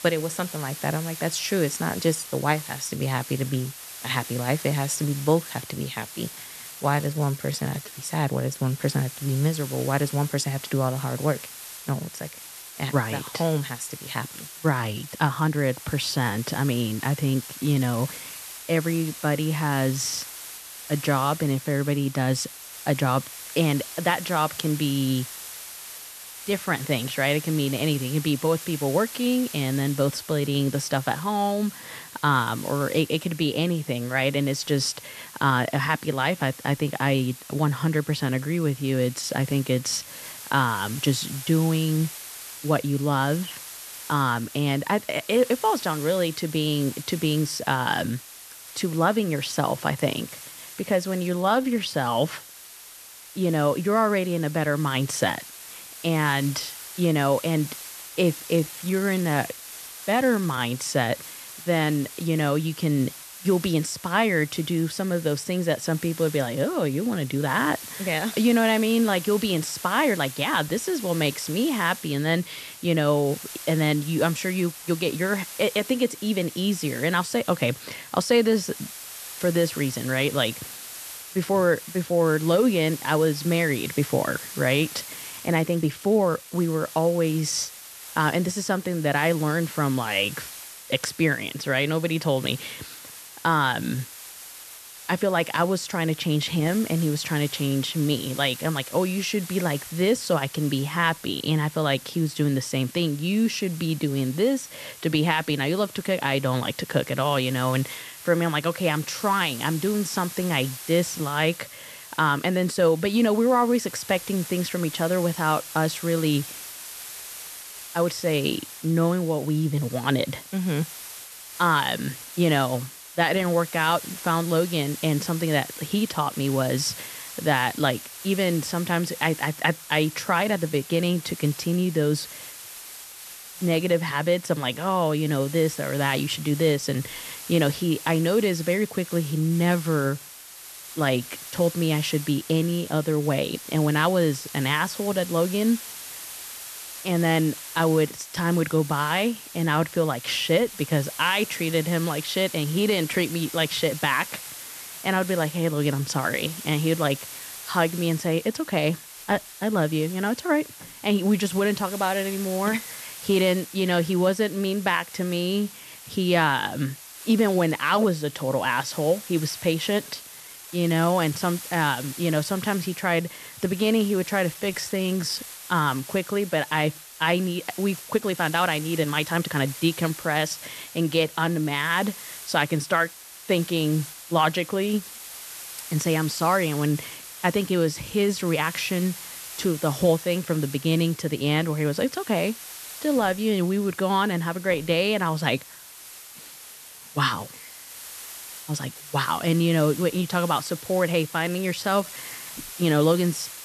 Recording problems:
hiss; noticeable; throughout; 15 dB below the speech
uneven, jittery; strongly; from 7 s to 3:22

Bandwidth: 13.5 kHz